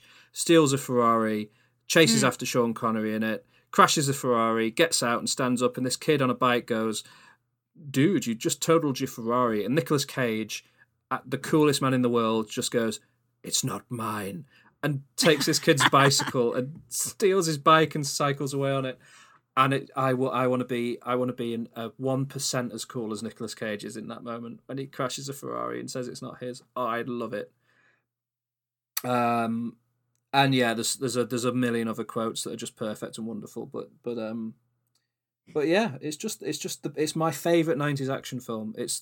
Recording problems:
none

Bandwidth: 17.5 kHz